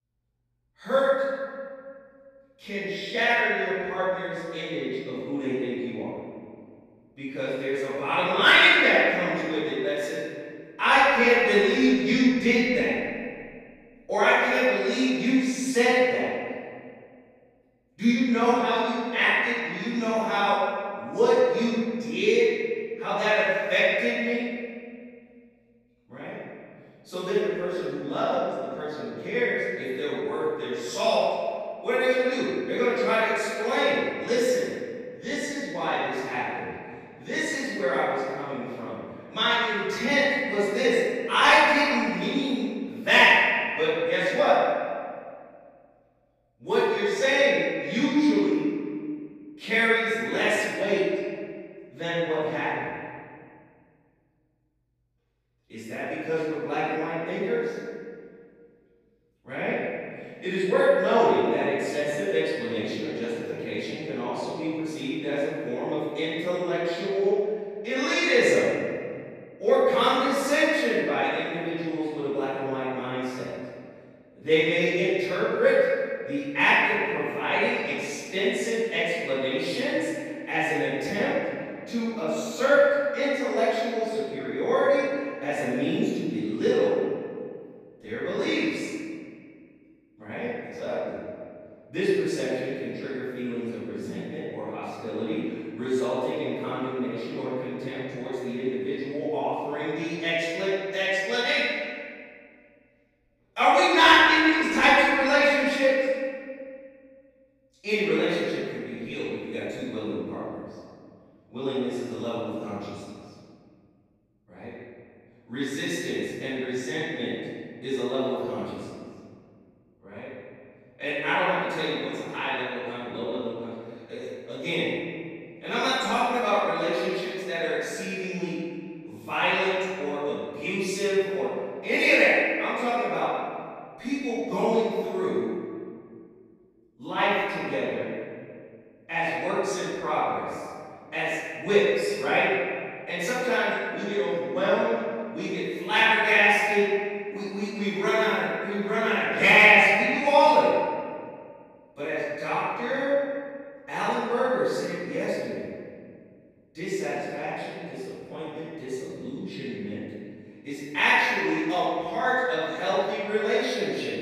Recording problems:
room echo; strong; dies away in 2 s
off-mic speech; far

